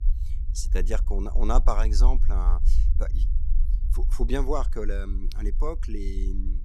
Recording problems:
low rumble; noticeable; throughout; 15 dB below the speech

